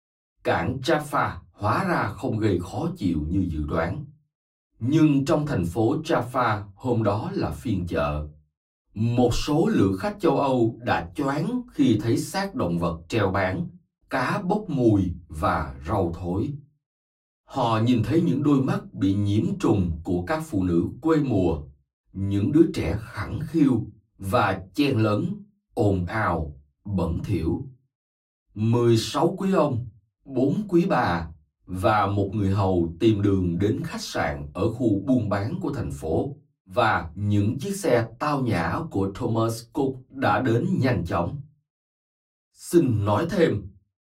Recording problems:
off-mic speech; far
room echo; very slight; dies away in 0.2 s

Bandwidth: 16 kHz